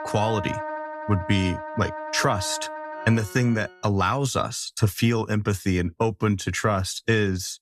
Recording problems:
background music; loud; until 3.5 s; 9 dB below the speech

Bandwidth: 14 kHz